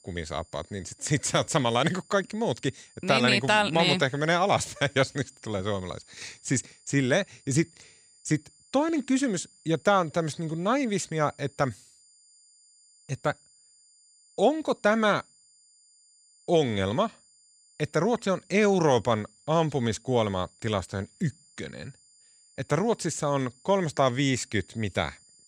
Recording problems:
high-pitched whine; faint; throughout; 7 kHz, 30 dB below the speech

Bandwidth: 15.5 kHz